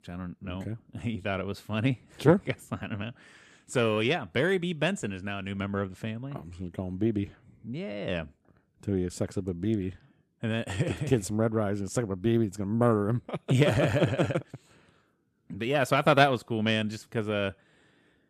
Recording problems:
none

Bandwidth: 14.5 kHz